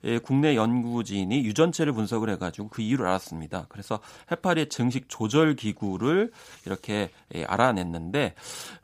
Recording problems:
none

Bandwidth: 15 kHz